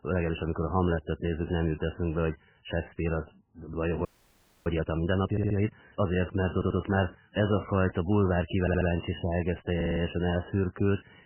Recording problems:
garbled, watery; badly; nothing above 3 kHz
audio freezing; at 4 s for 0.5 s
audio stuttering; 4 times, first at 5.5 s

